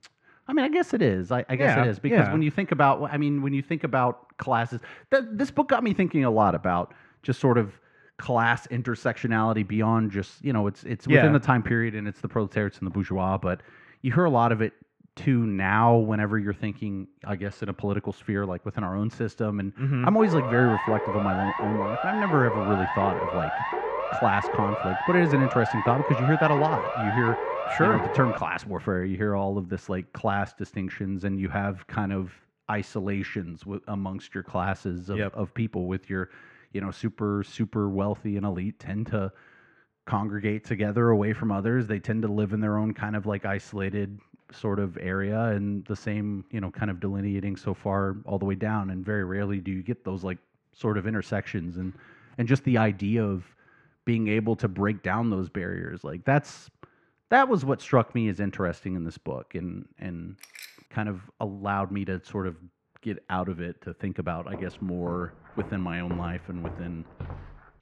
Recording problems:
muffled; very; fading above 2 kHz
siren; noticeable; from 20 to 28 s; peak 2 dB below the speech
jangling keys; faint; at 1:00; peak 15 dB below the speech
footsteps; faint; from 1:05 on; peak 15 dB below the speech

